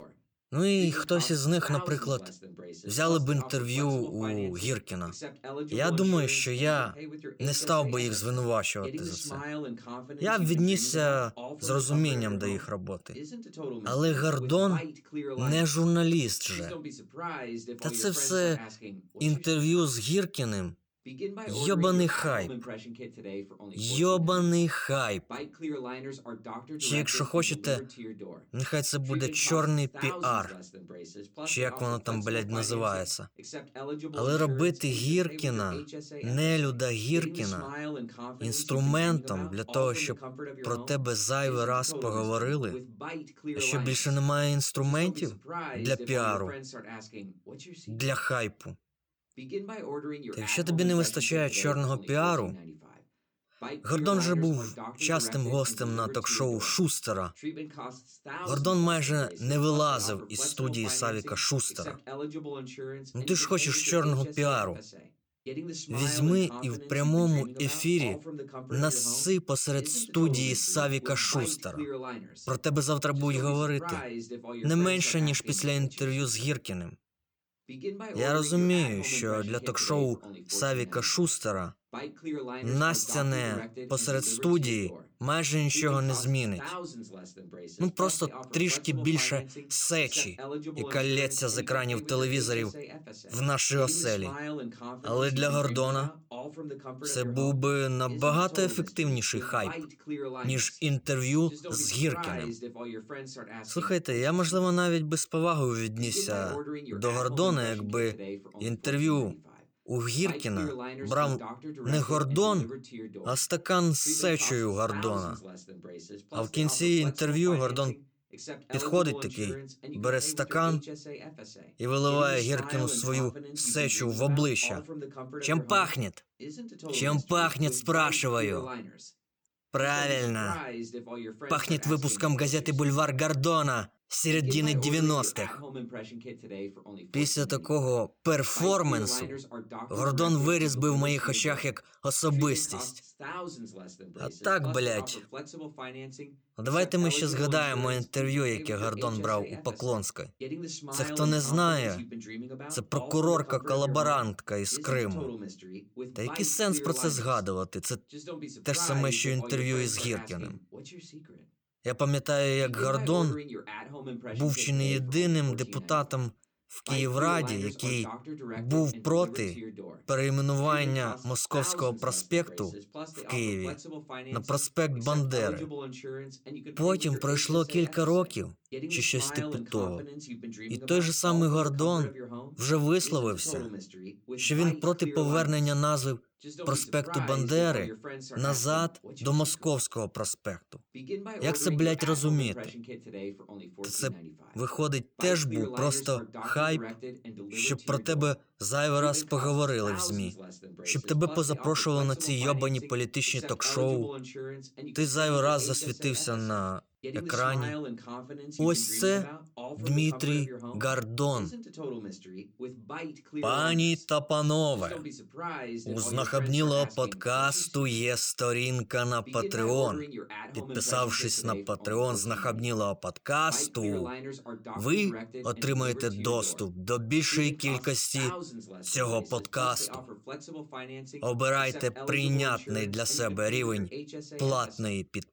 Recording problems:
voice in the background; noticeable; throughout; 15 dB below the speech

